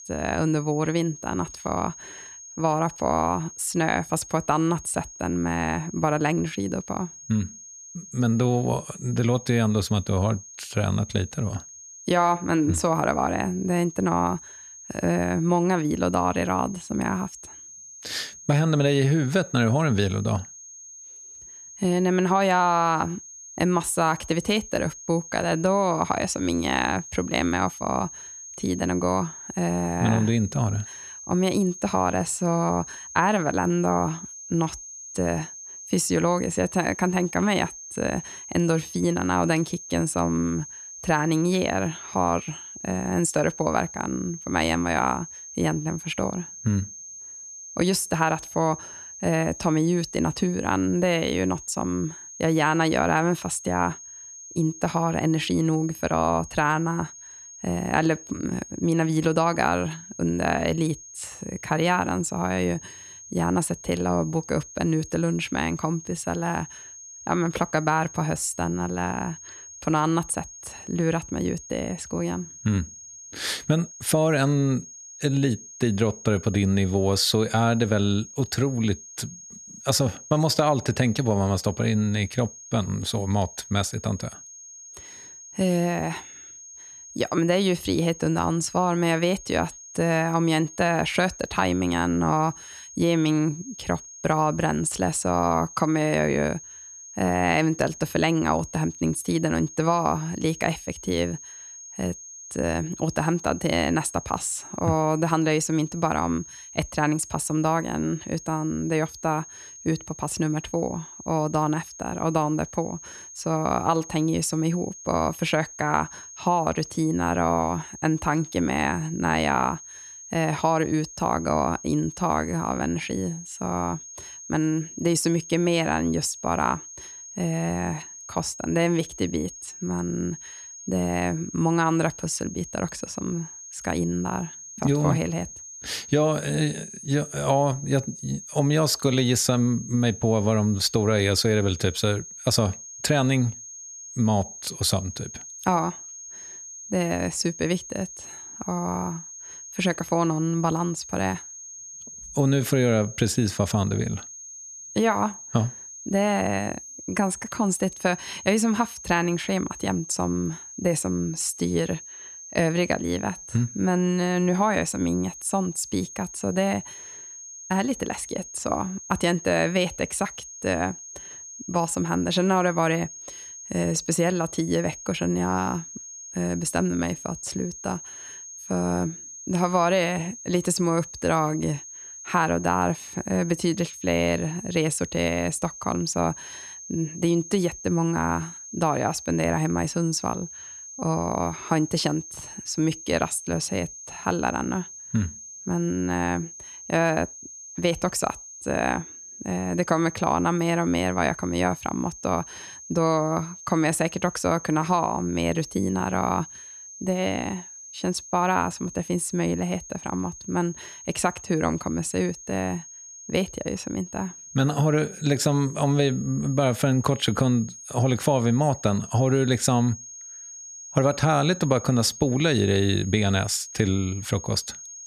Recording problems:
high-pitched whine; noticeable; throughout; 6.5 kHz, 15 dB below the speech

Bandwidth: 14 kHz